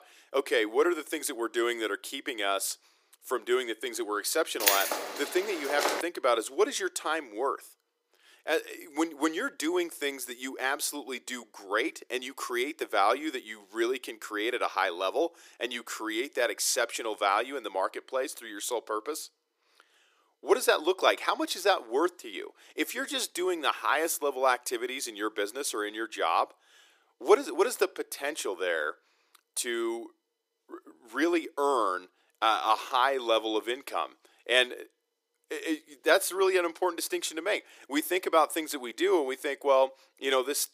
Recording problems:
thin; somewhat; fading below 350 Hz
jangling keys; loud; from 4.5 to 6 s; peak 5 dB above the speech

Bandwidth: 15 kHz